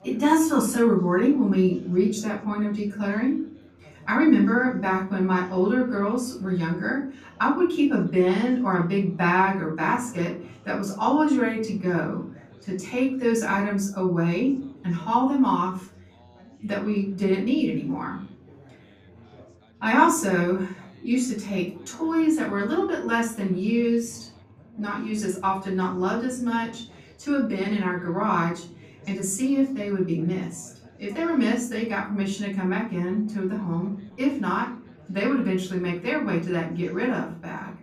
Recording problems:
off-mic speech; far
room echo; slight; dies away in 0.4 s
background chatter; faint; throughout; 3 voices, 25 dB below the speech

